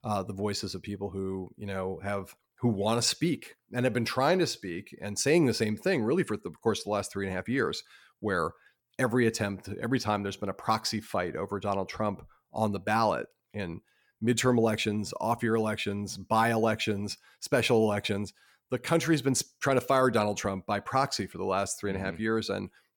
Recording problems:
none

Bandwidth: 17.5 kHz